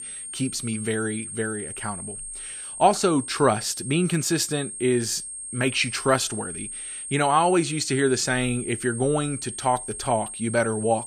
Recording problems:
high-pitched whine; loud; throughout; 8.5 kHz, 8 dB below the speech

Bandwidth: 14.5 kHz